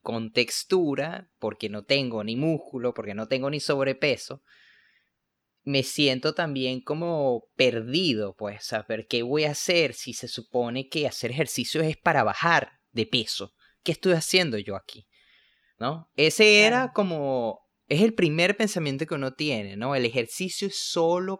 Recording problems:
none

